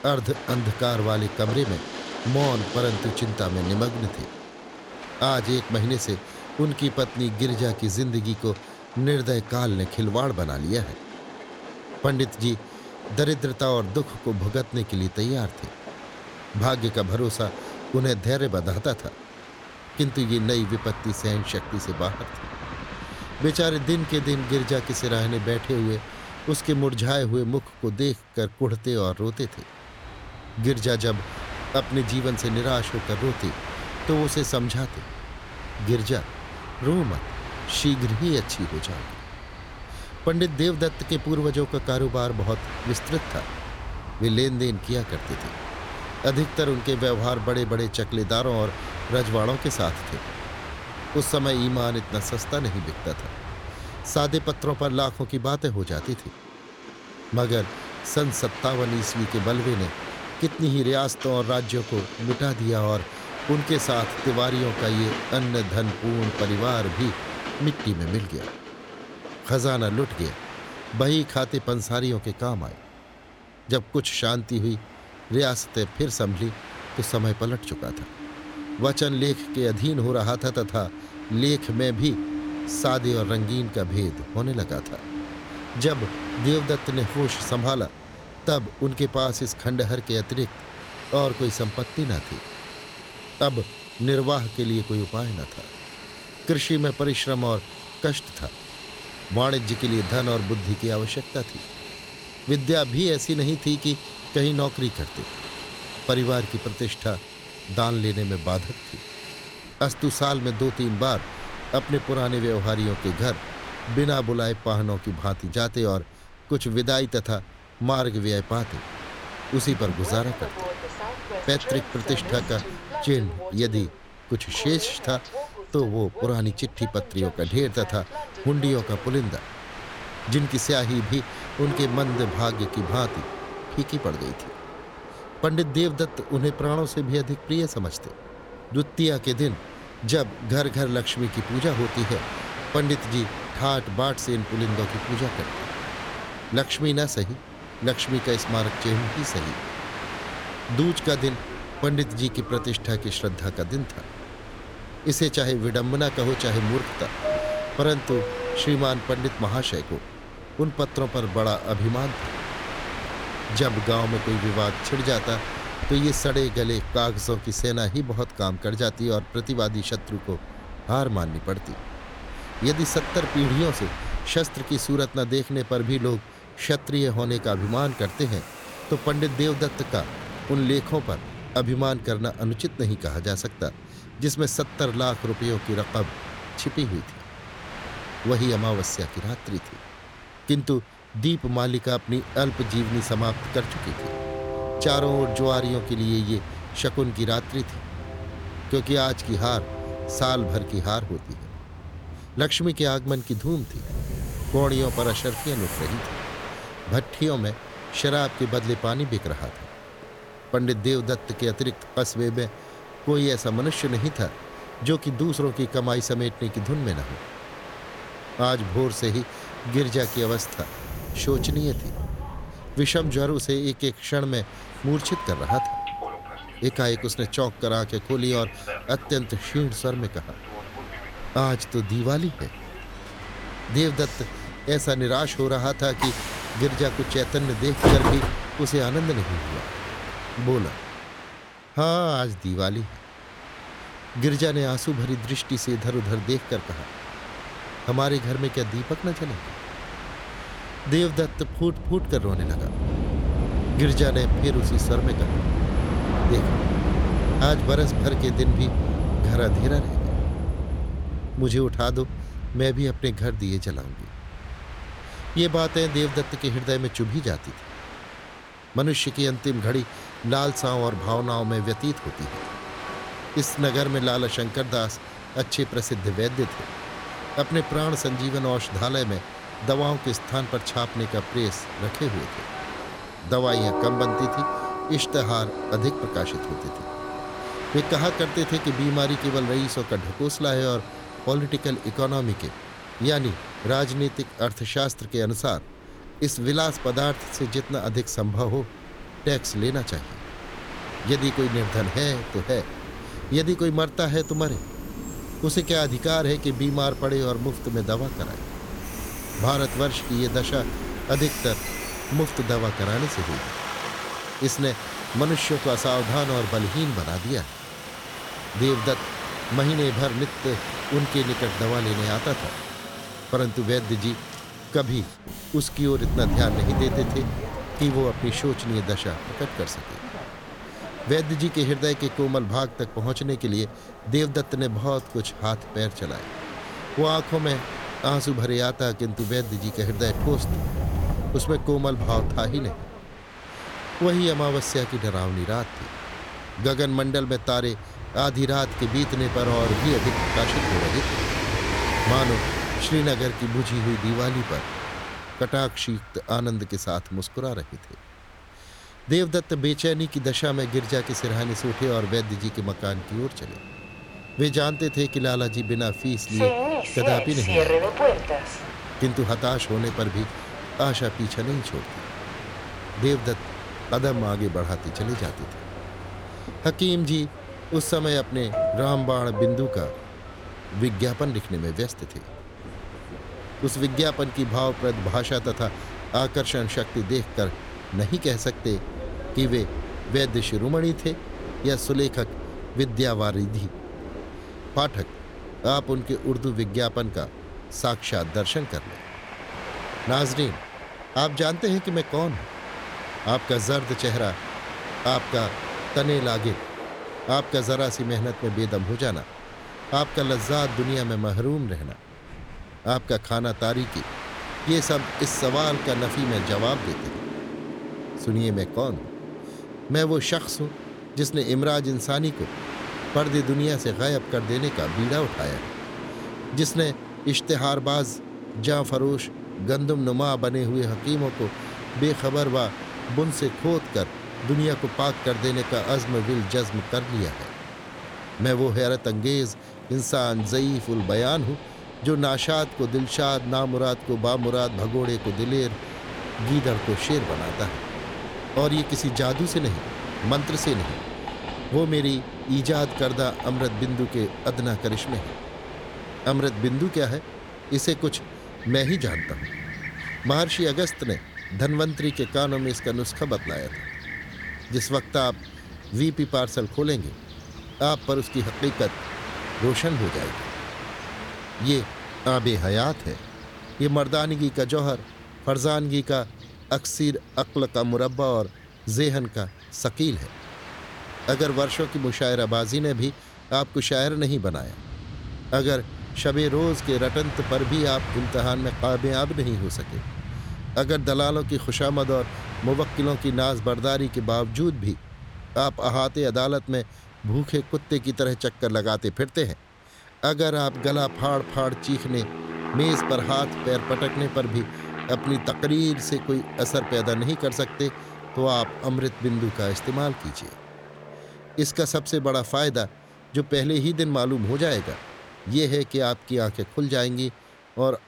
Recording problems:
train or aircraft noise; loud; throughout; 8 dB below the speech

